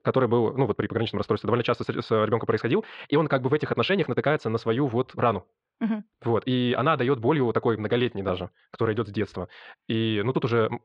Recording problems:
wrong speed, natural pitch; too fast; 1.5 times normal speed
muffled; slightly; fading above 3.5 kHz

